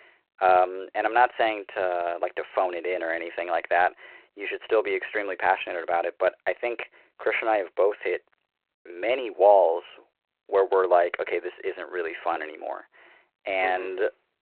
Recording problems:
phone-call audio

